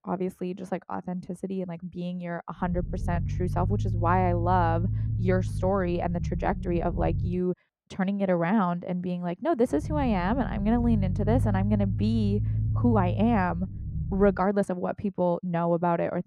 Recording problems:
muffled; slightly; fading above 2.5 kHz
low rumble; noticeable; from 2.5 to 7.5 s and from 10 to 14 s; 15 dB below the speech
uneven, jittery; strongly; from 1 to 16 s

